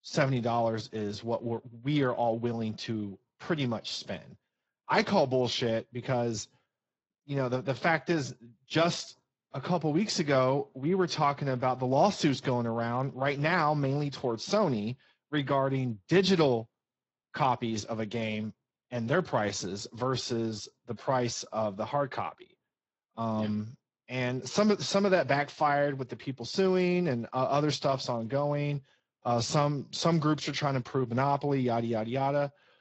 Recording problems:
garbled, watery; slightly; nothing above 7.5 kHz
high frequencies cut off; slight

